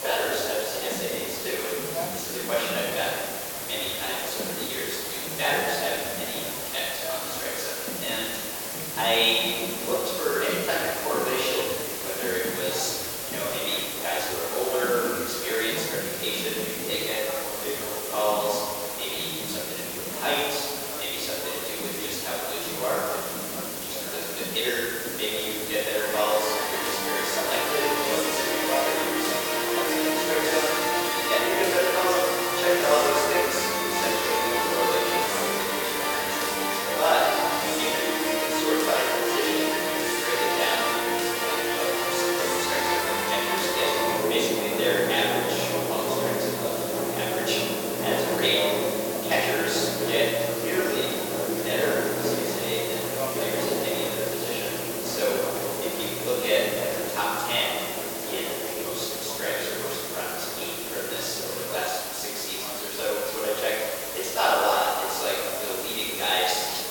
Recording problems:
room echo; strong; dies away in 1.9 s
off-mic speech; far
thin; somewhat; fading below 400 Hz
background music; loud; throughout; as loud as the speech
hiss; loud; throughout; 3 dB below the speech
chatter from many people; noticeable; throughout; 10 dB below the speech

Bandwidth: 17.5 kHz